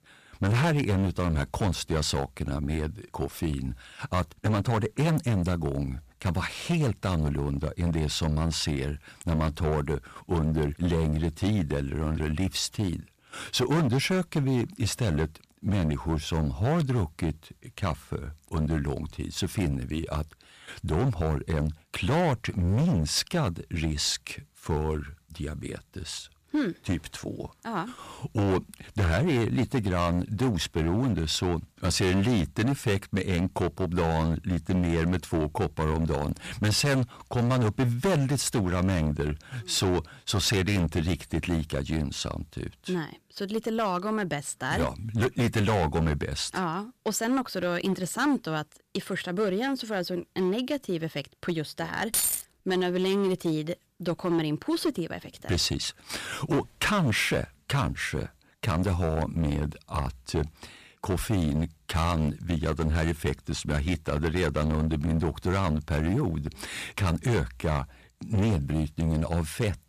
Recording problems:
distortion; heavy; 11% of the sound clipped
jangling keys; loud; at 52 s; peak 4 dB above the speech

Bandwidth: 14.5 kHz